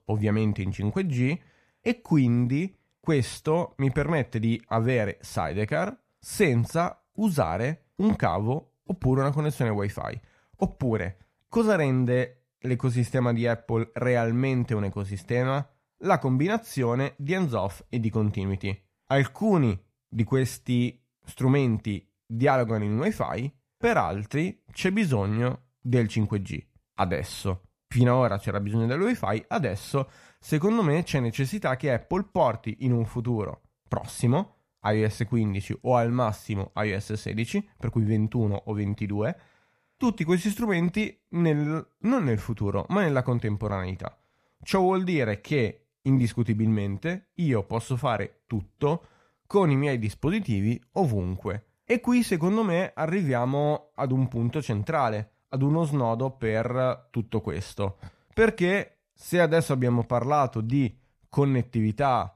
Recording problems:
none

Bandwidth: 14 kHz